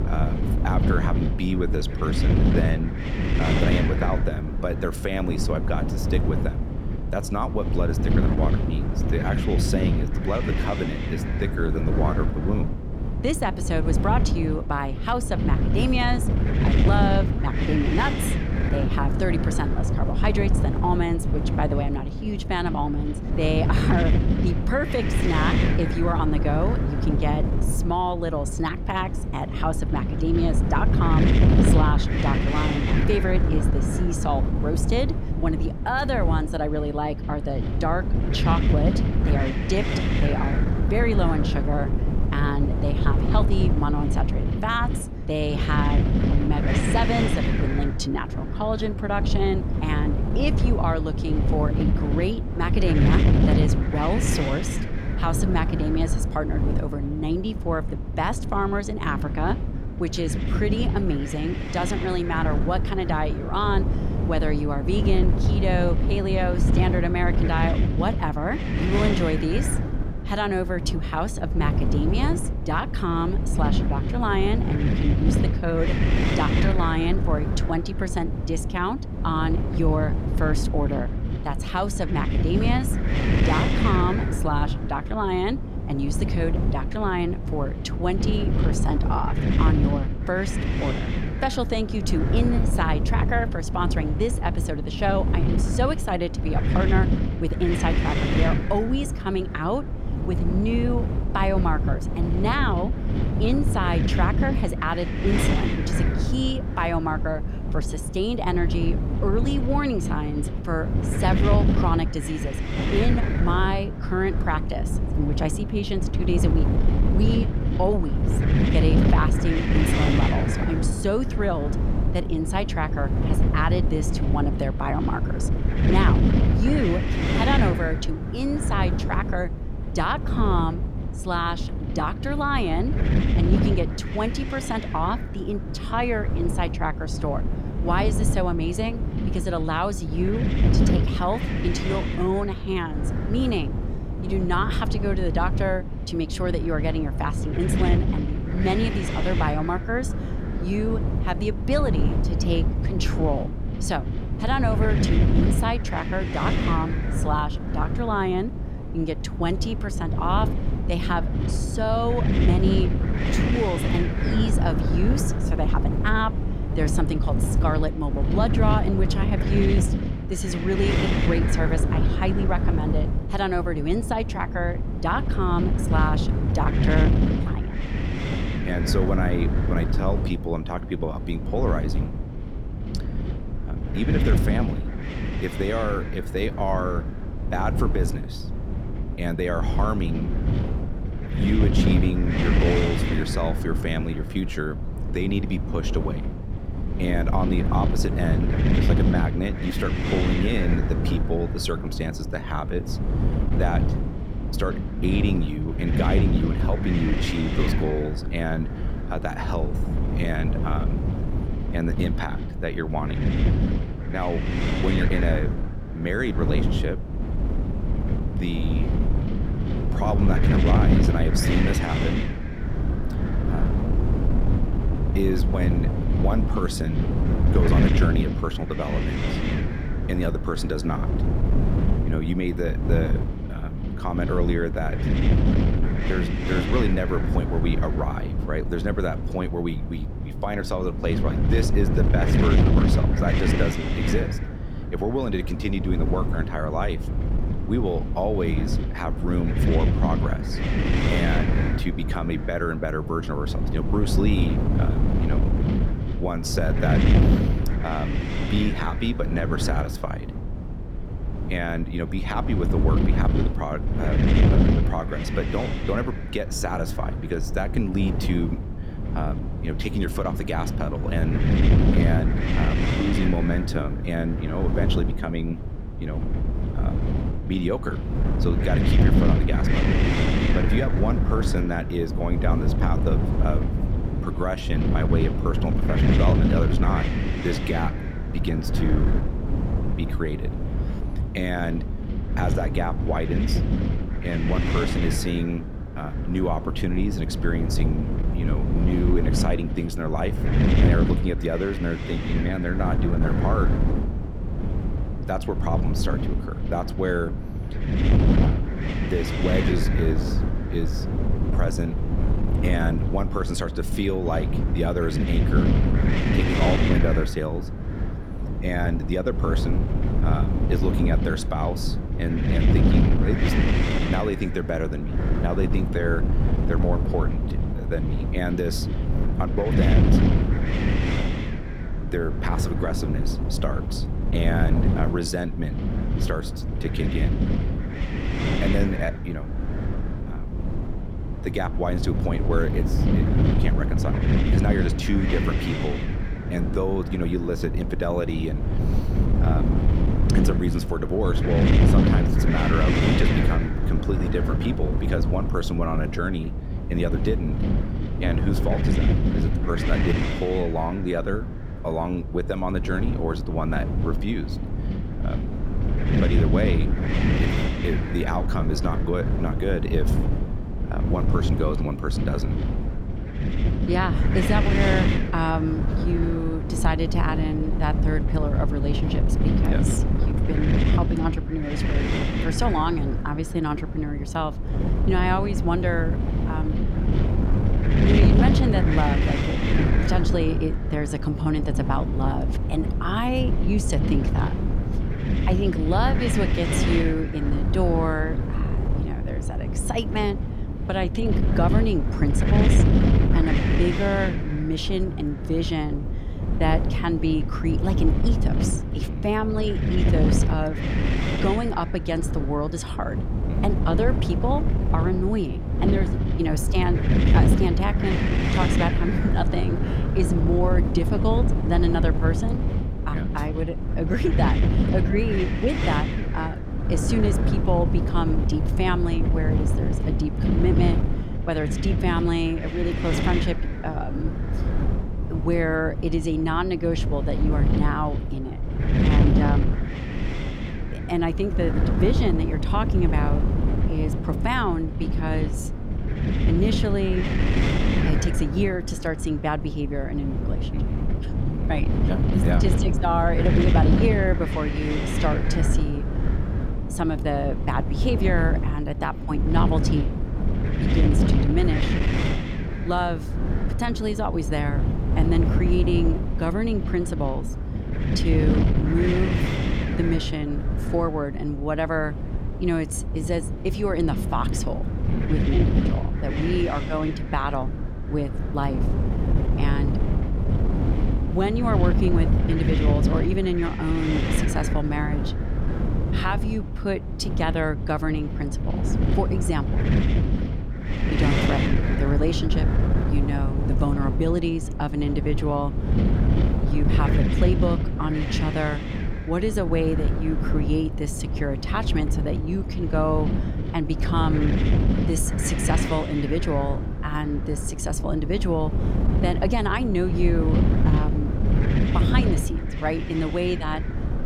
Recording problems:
wind noise on the microphone; heavy; 4 dB below the speech

